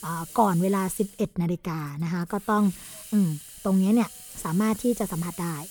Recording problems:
hiss; noticeable; throughout; 15 dB below the speech

